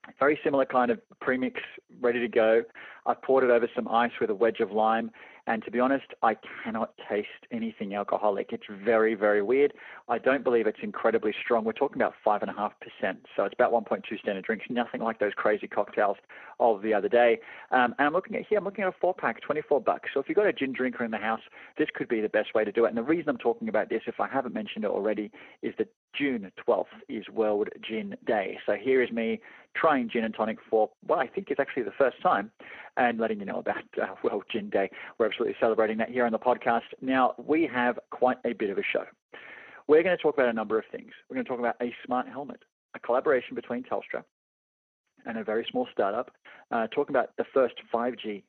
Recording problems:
phone-call audio; poor line
garbled, watery; slightly

